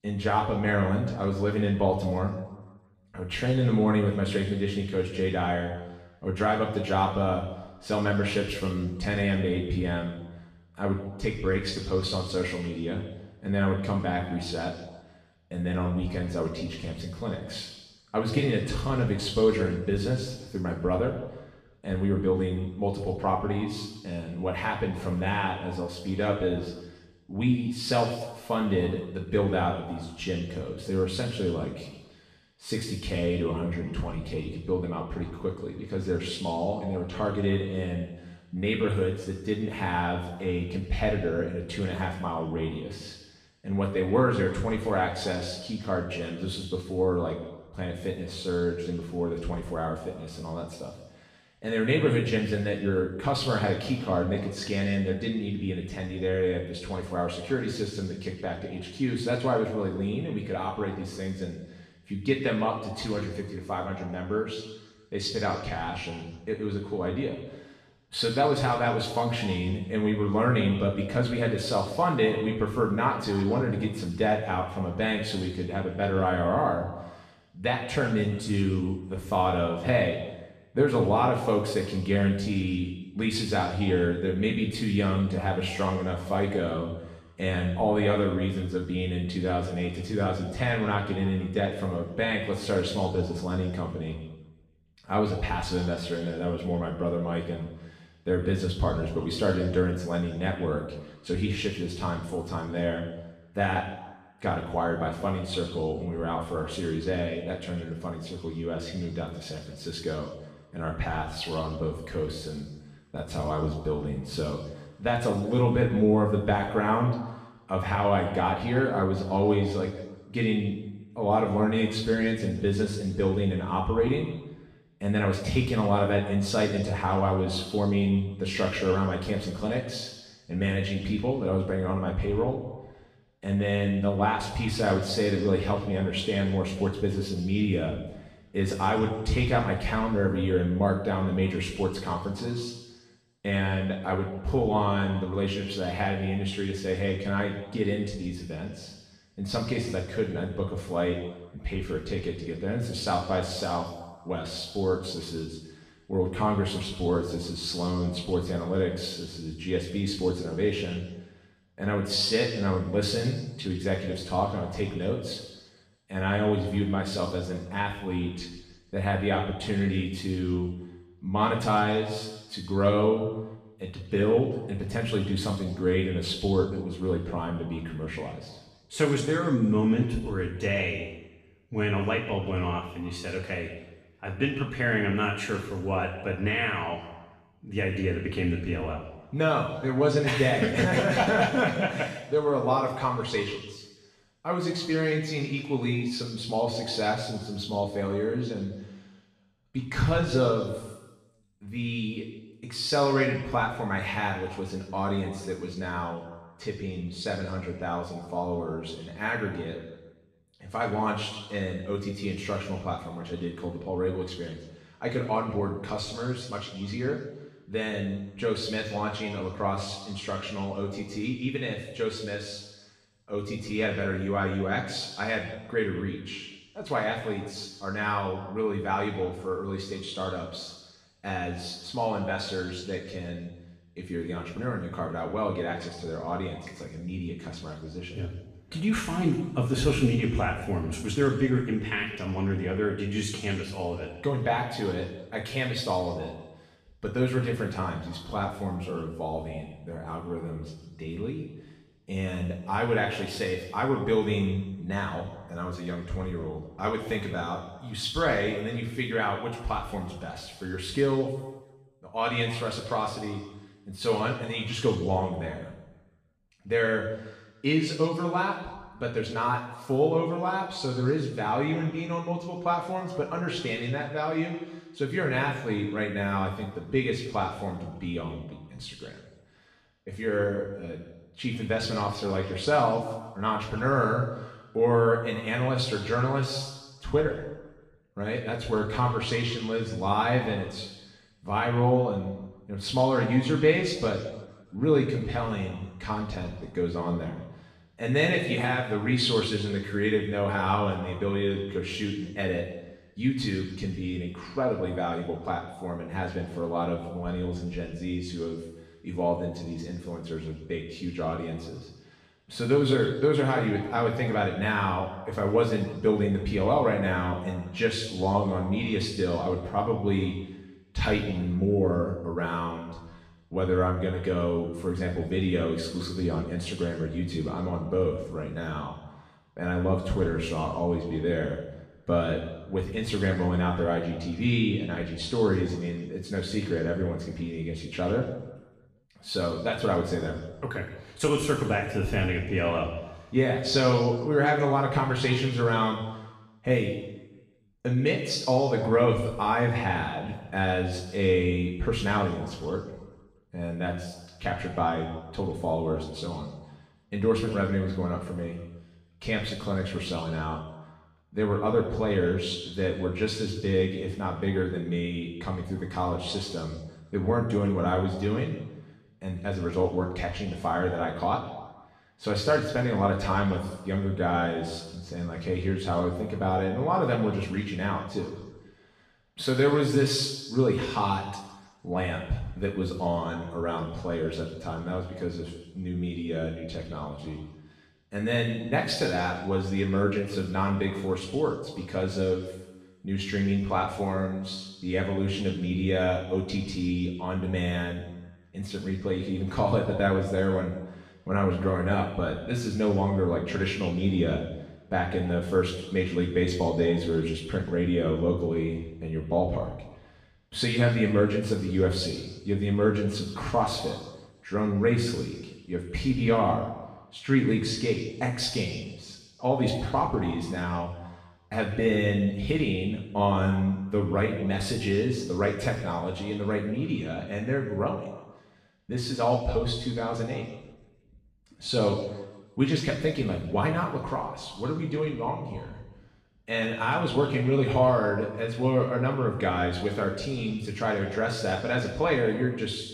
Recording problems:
off-mic speech; far
room echo; noticeable; dies away in 1.1 s

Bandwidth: 14.5 kHz